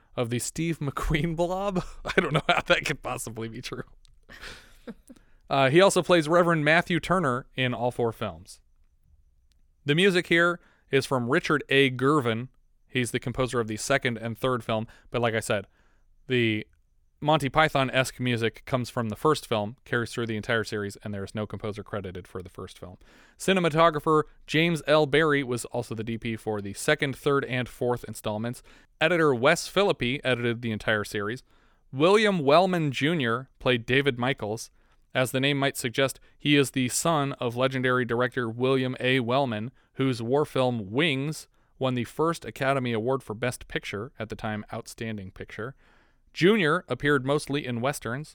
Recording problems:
none

